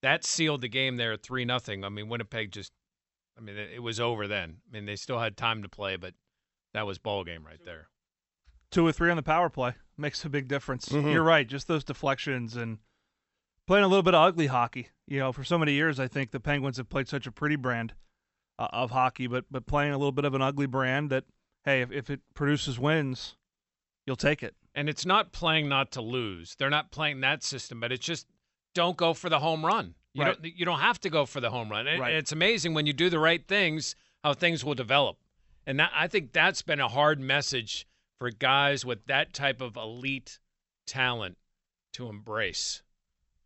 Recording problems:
high frequencies cut off; noticeable; nothing above 8 kHz

